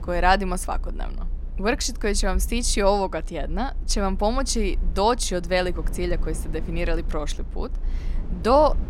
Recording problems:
low rumble; faint; throughout; 25 dB below the speech

